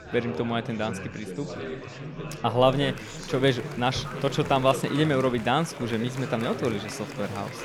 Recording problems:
chatter from many people; loud; throughout; 9 dB below the speech

